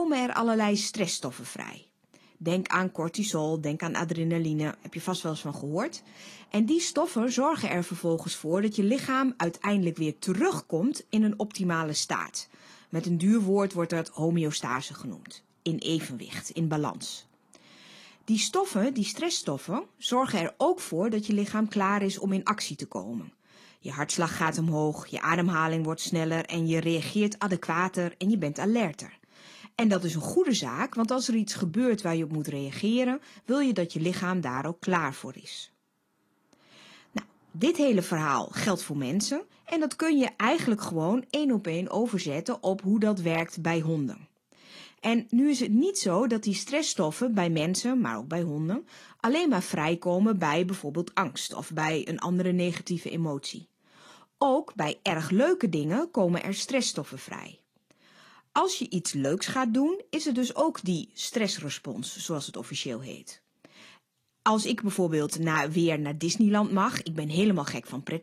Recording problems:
garbled, watery; slightly
abrupt cut into speech; at the start

